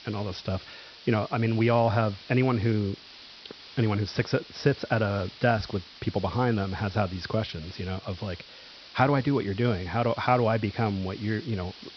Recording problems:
high frequencies cut off; noticeable; nothing above 5.5 kHz
hiss; noticeable; throughout; 20 dB below the speech

